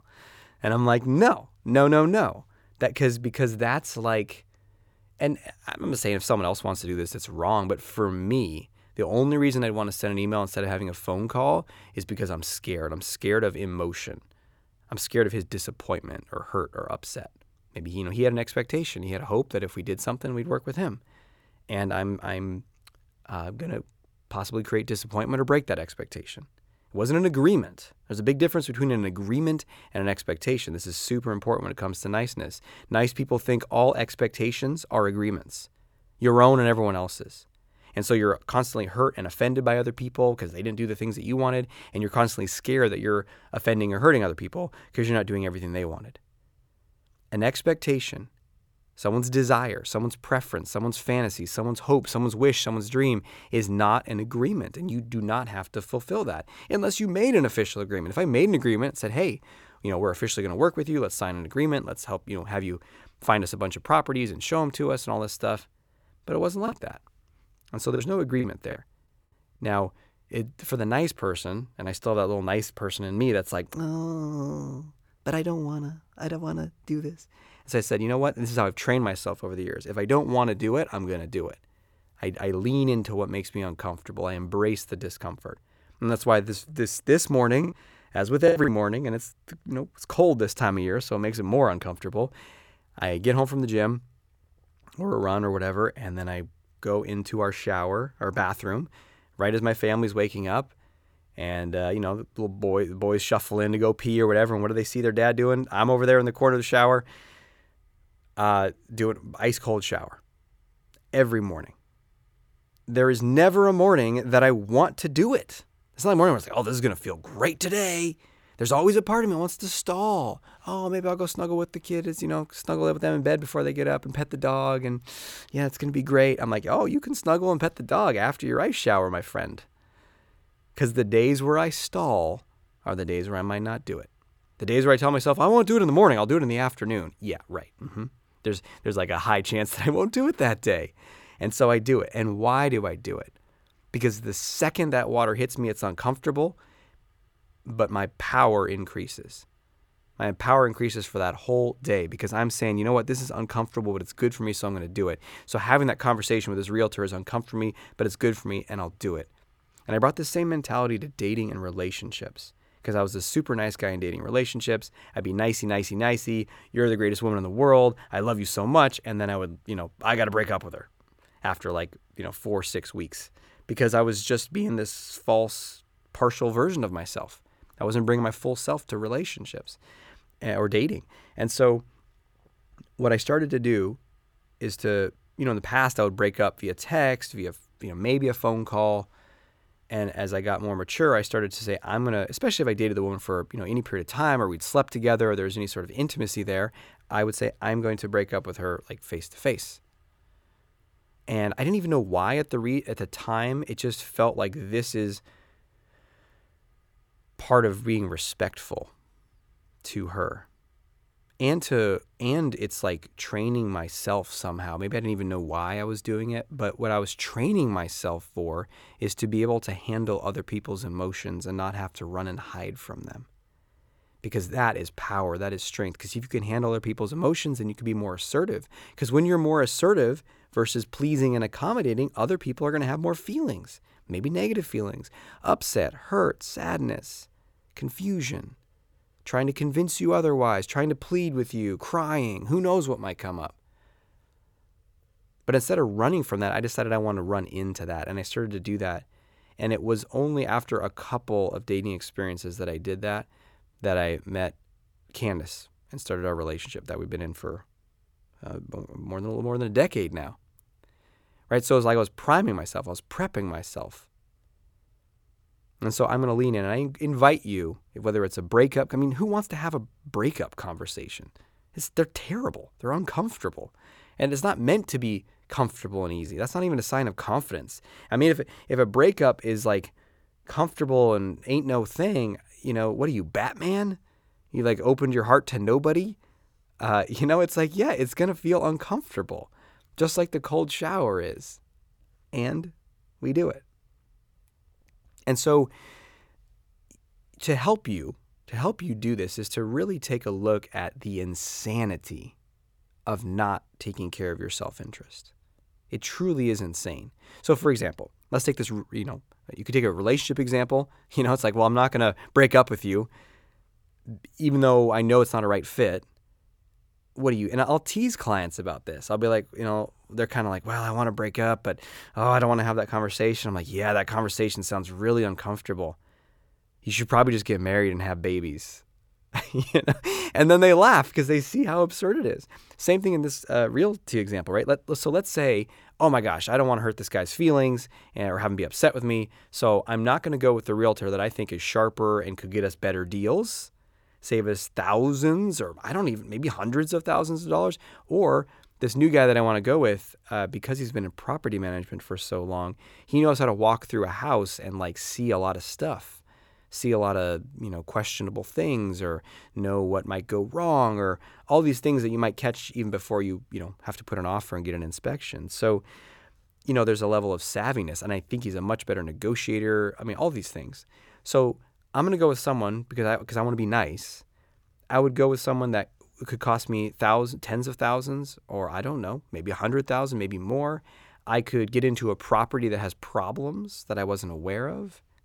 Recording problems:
choppy; very; from 1:07 to 1:09 and from 1:28 to 1:29; 11% of the speech affected

